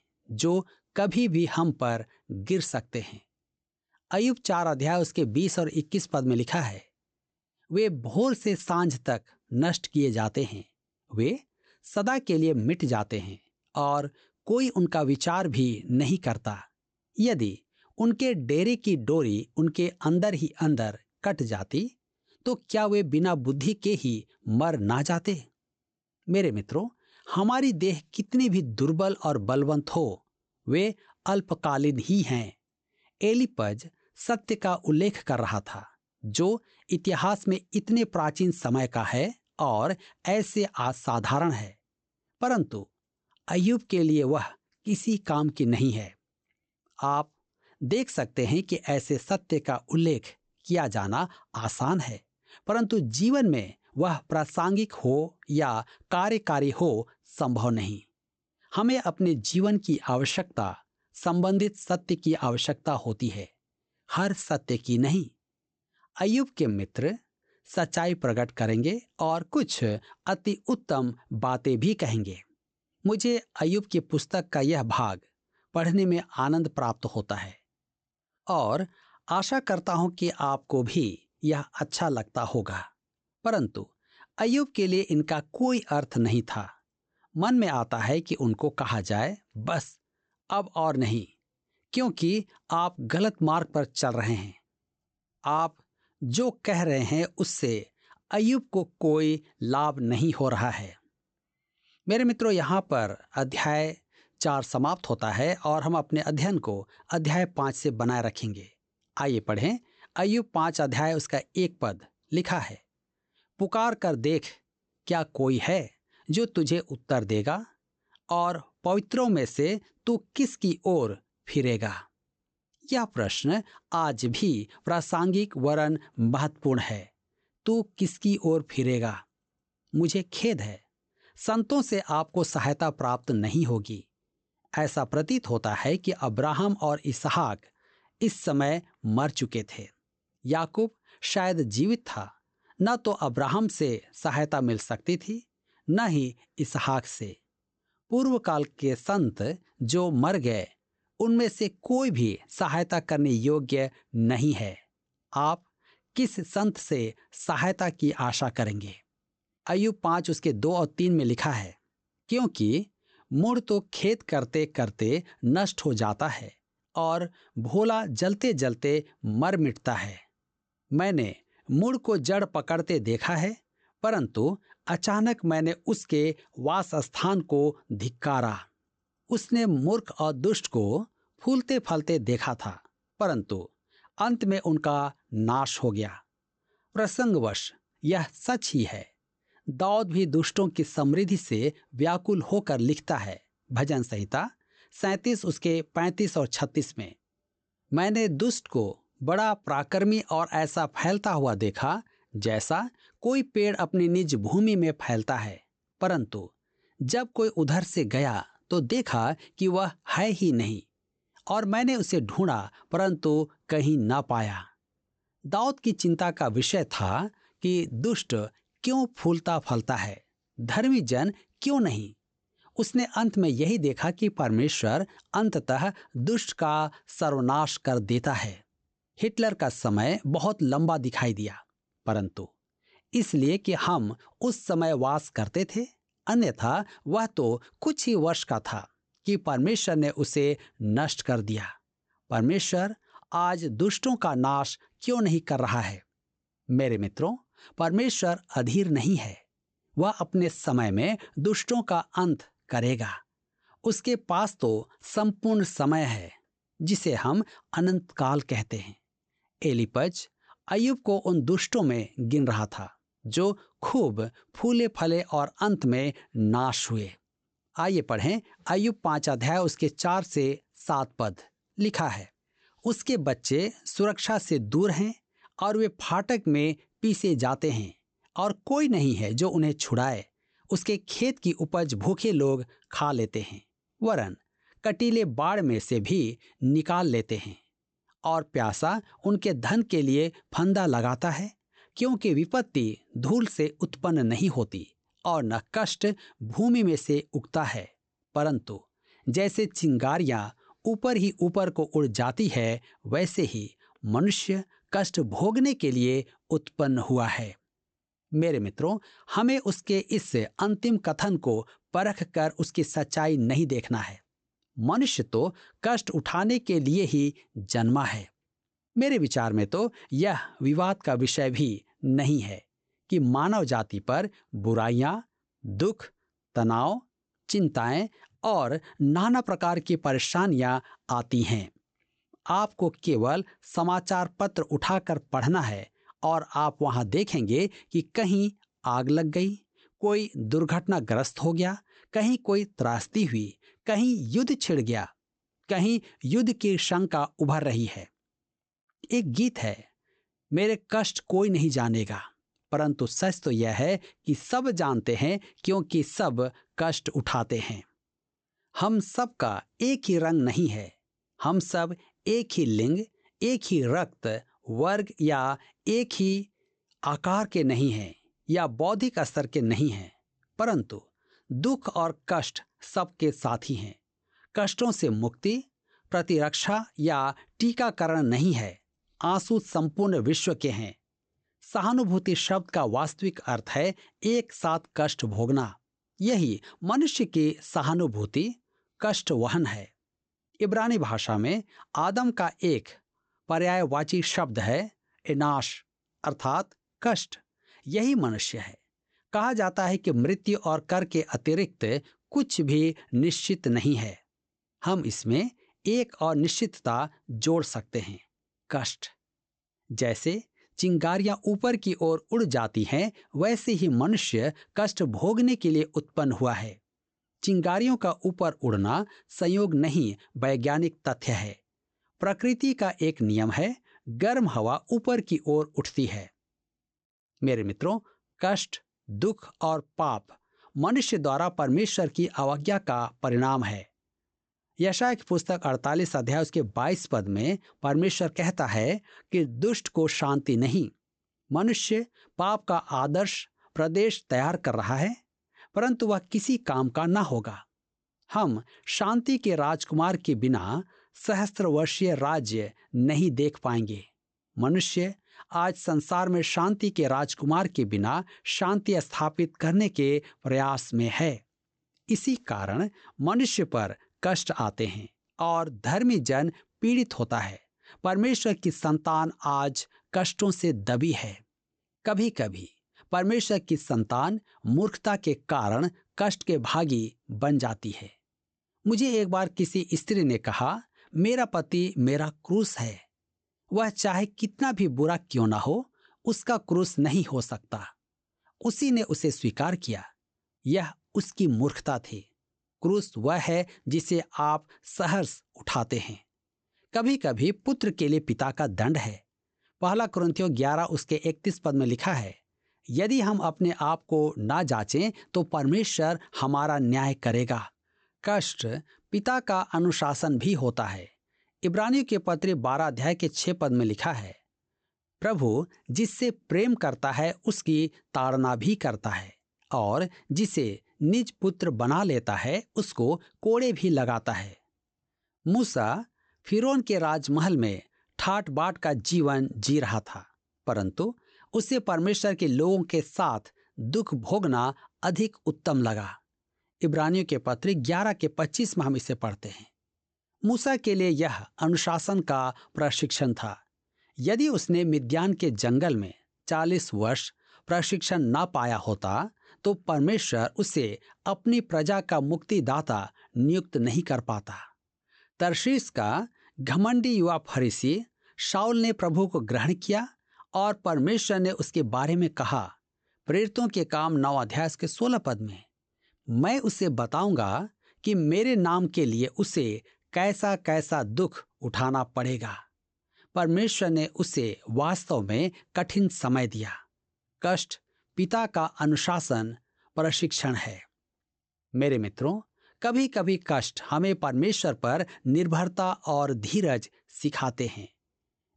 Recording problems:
high frequencies cut off; noticeable; nothing above 8 kHz

